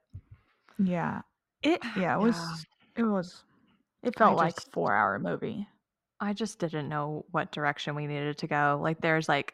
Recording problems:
muffled; slightly; fading above 2.5 kHz

